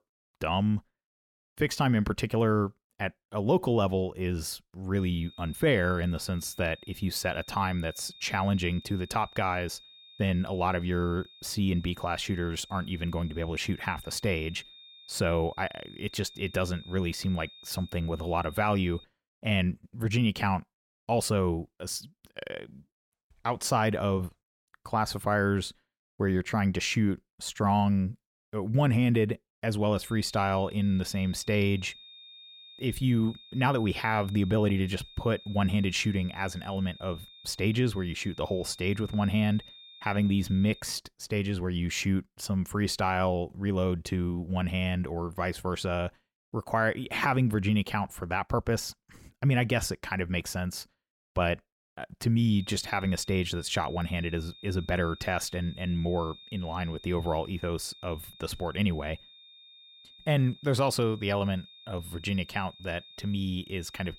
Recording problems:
high-pitched whine; noticeable; from 5 to 19 s, from 30 to 41 s and from 53 s on; 3.5 kHz, 20 dB below the speech

